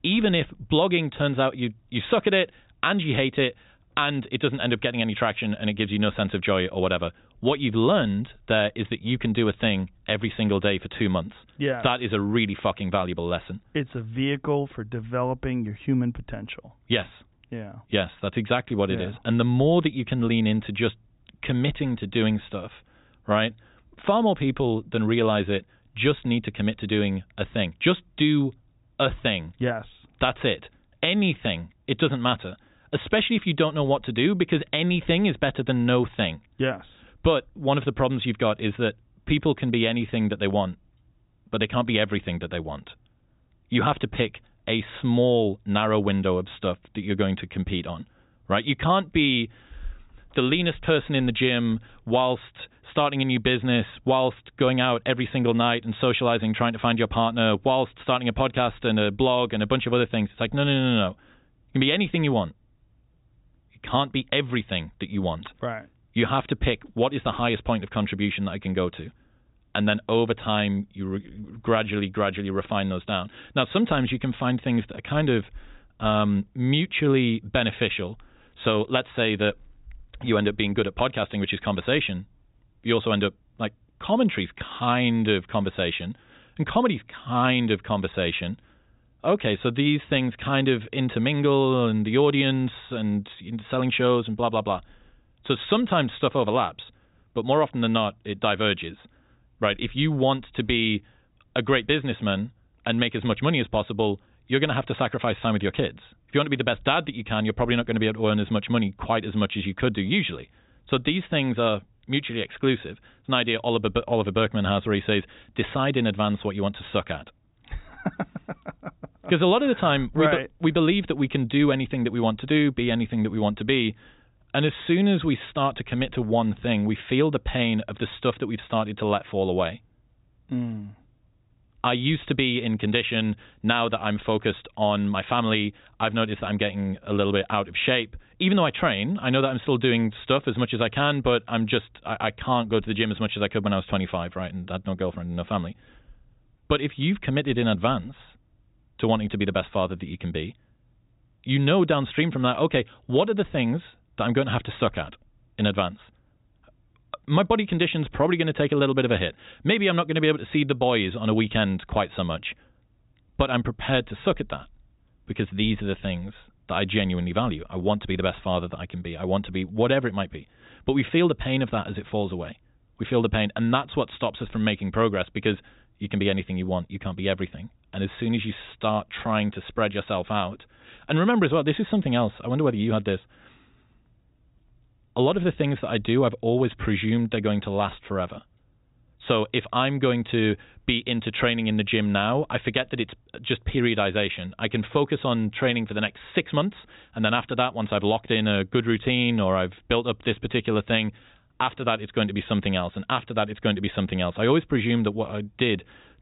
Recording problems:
high frequencies cut off; severe; nothing above 4 kHz

